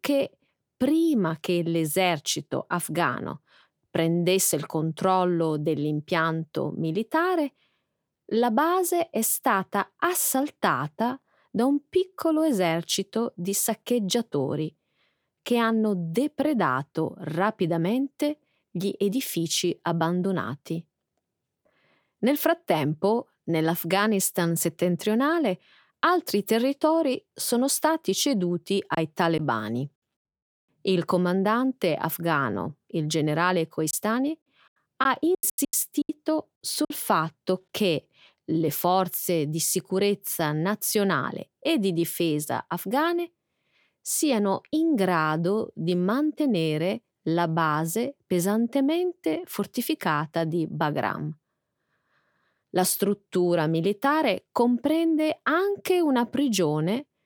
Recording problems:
choppy; very; at 29 s and from 34 to 37 s; 12% of the speech affected

